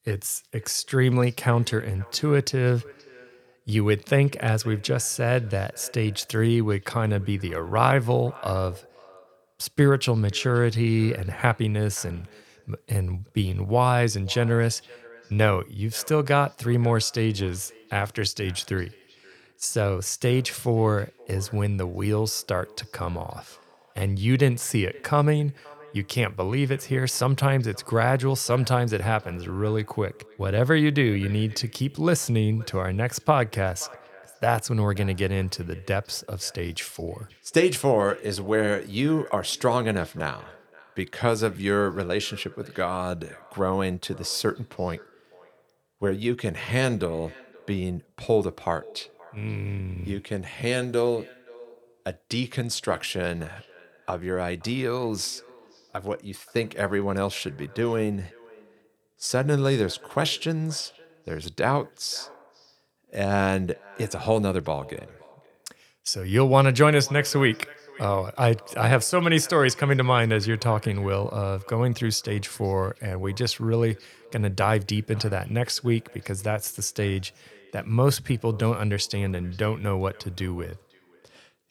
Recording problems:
echo of what is said; faint; throughout; 520 ms later, 25 dB below the speech

